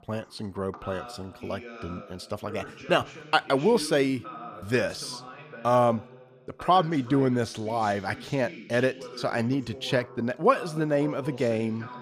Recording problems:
voice in the background; noticeable; throughout; 15 dB below the speech

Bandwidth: 14.5 kHz